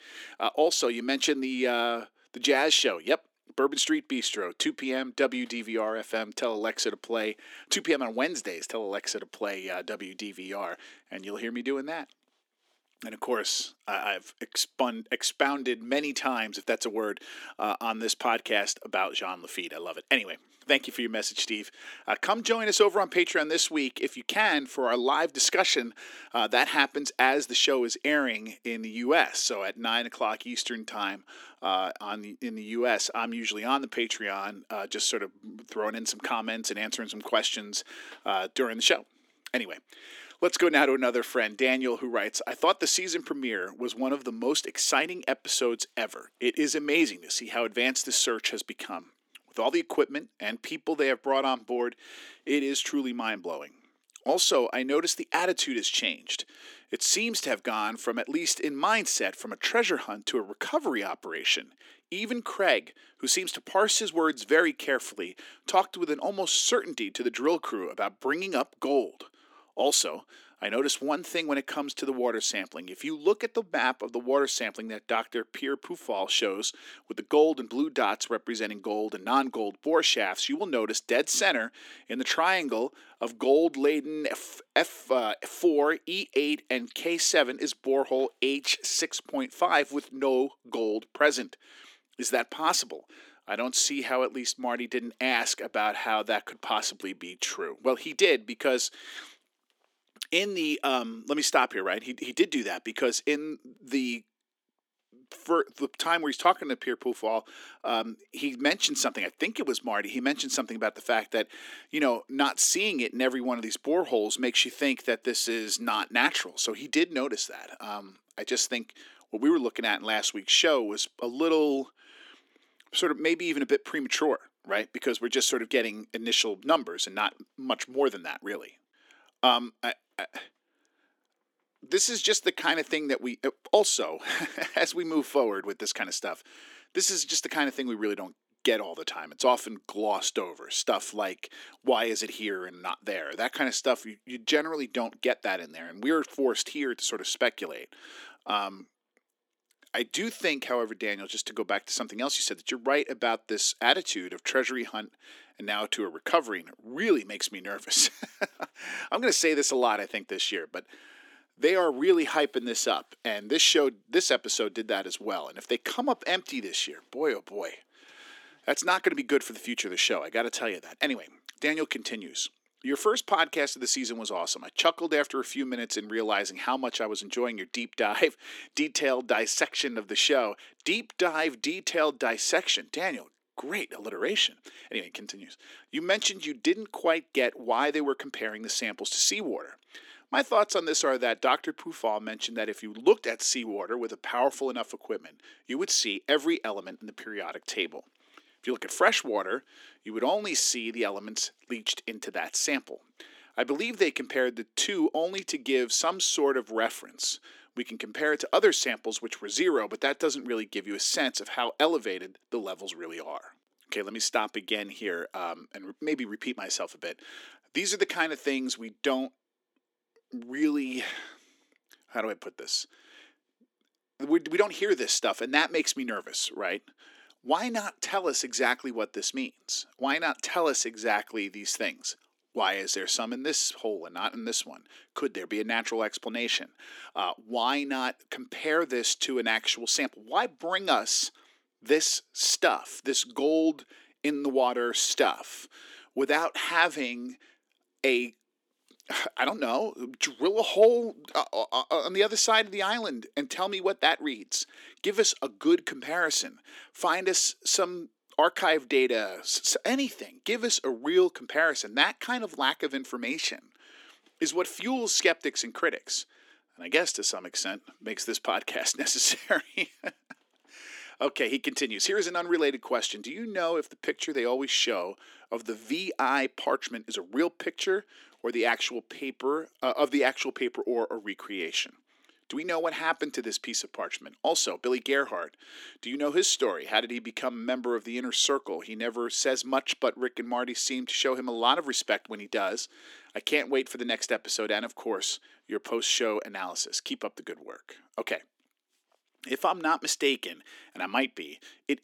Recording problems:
thin; somewhat; fading below 300 Hz

